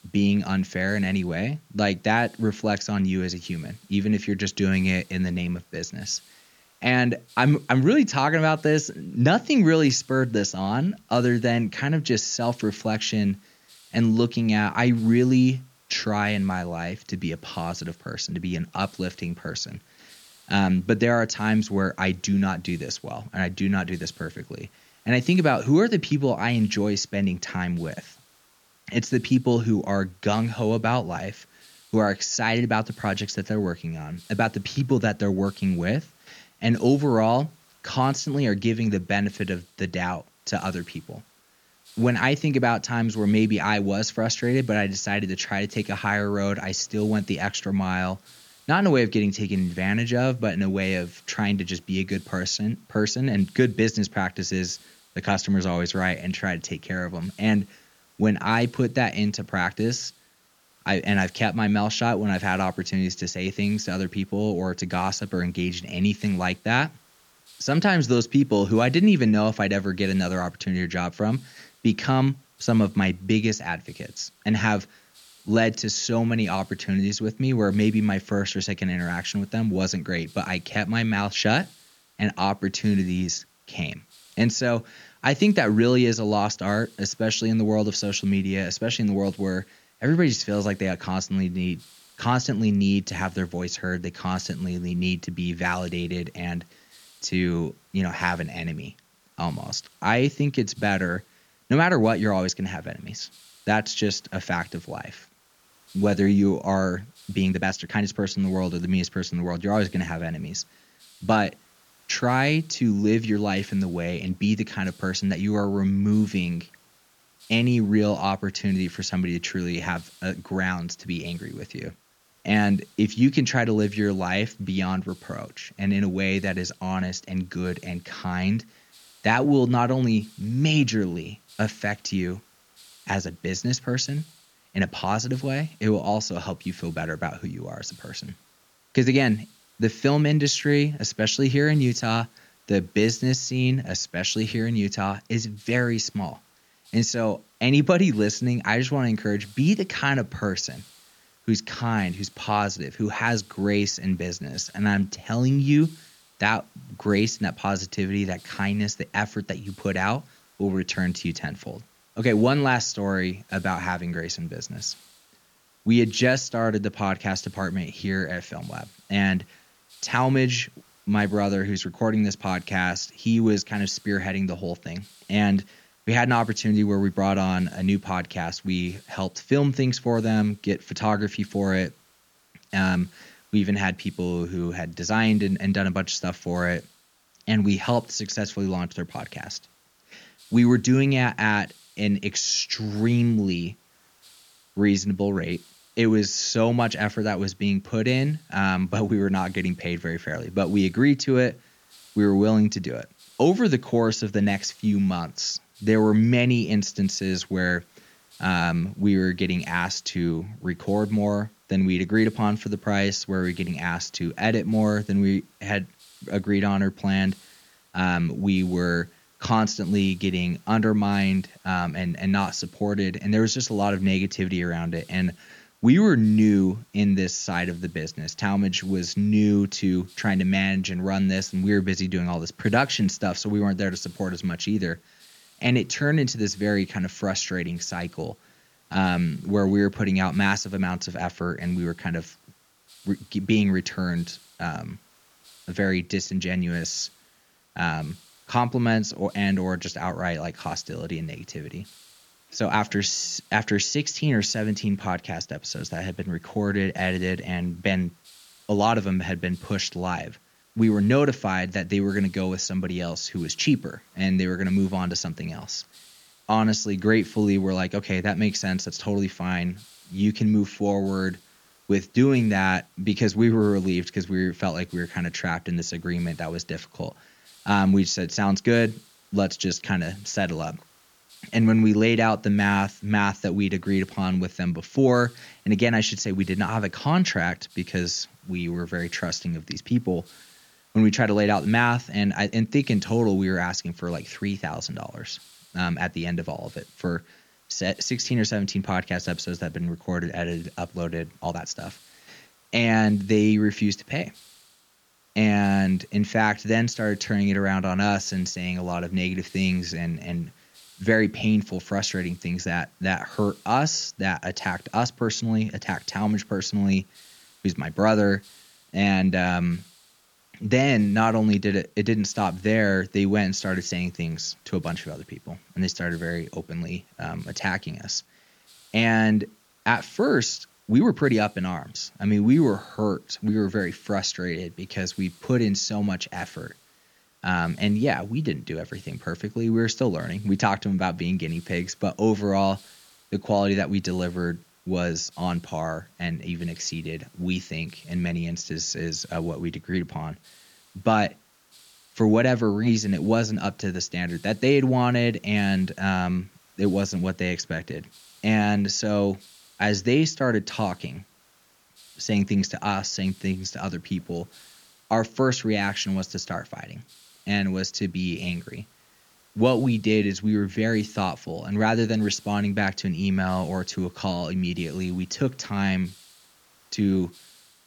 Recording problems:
high frequencies cut off; noticeable; nothing above 7 kHz
hiss; faint; throughout; 30 dB below the speech
uneven, jittery; strongly; from 1:47 to 5:31

